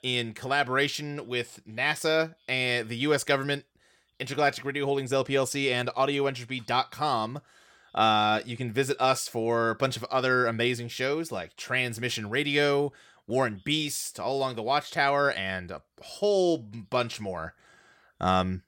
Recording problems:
none

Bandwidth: 17 kHz